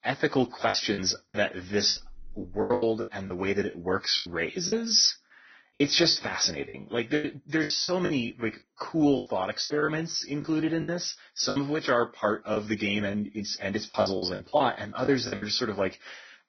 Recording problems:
garbled, watery; badly; nothing above 6 kHz
choppy; very; 11% of the speech affected

